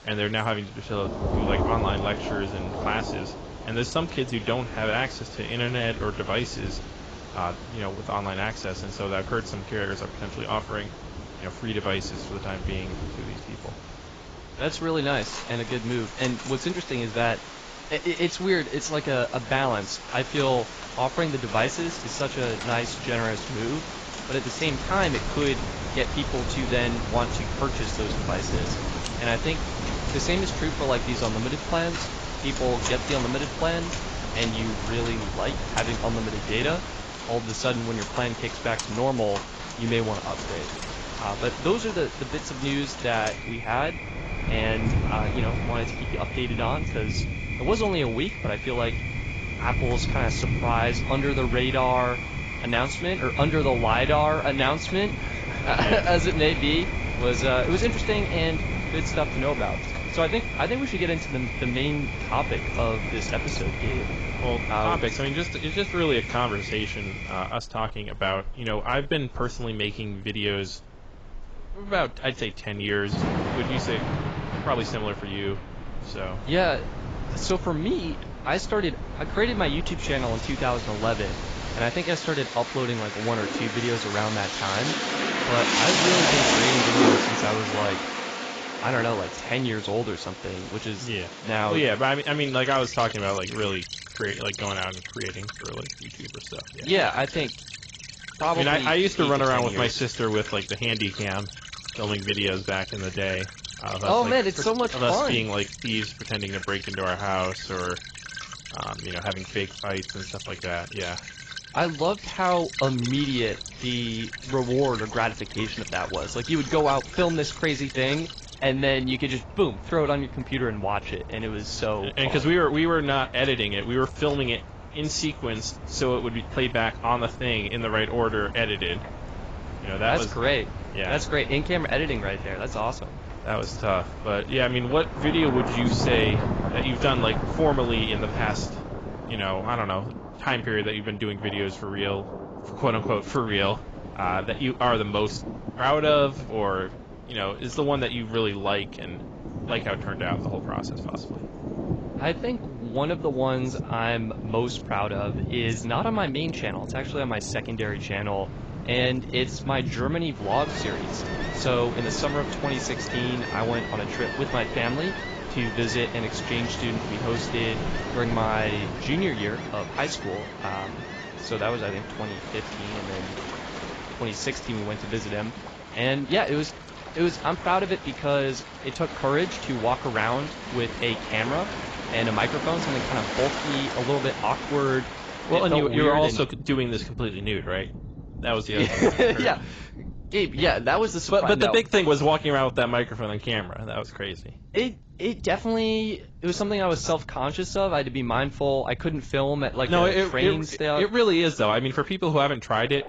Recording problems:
garbled, watery; badly; nothing above 7.5 kHz
rain or running water; loud; throughout; 6 dB below the speech
wind noise on the microphone; occasional gusts; from 25 s to 1:22 and from 1:53 to 2:49; 15 dB below the speech

